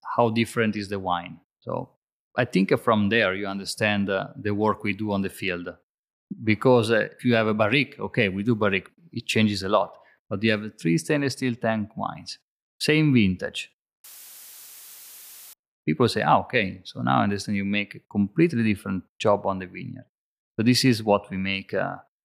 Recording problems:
audio cutting out; filled with static; at 14 s for 1.5 s

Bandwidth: 15 kHz